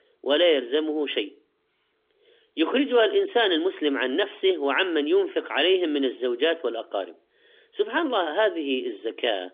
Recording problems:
phone-call audio; nothing above 3.5 kHz

